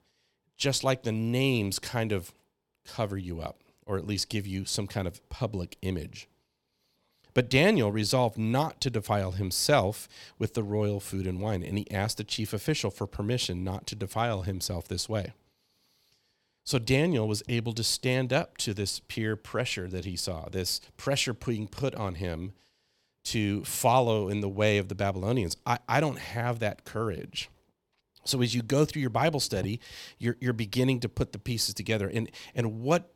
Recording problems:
none

